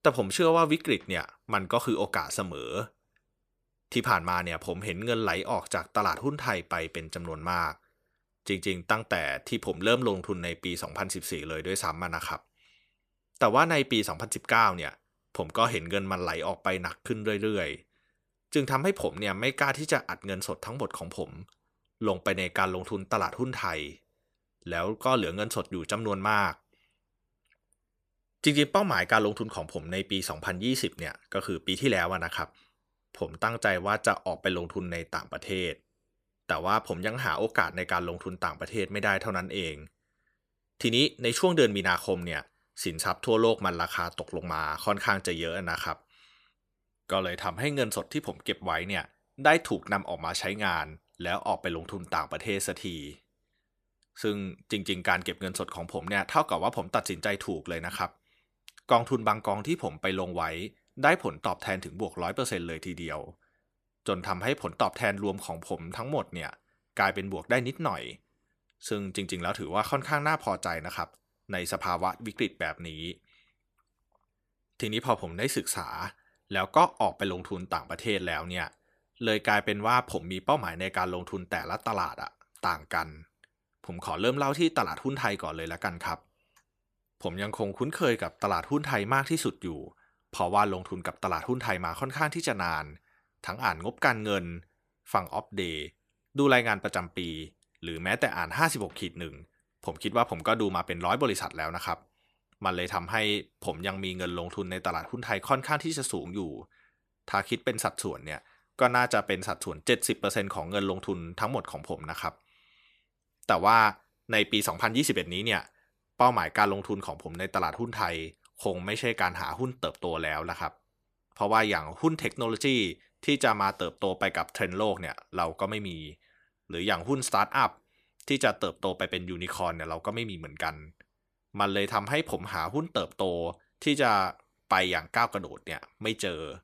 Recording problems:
none

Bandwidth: 14.5 kHz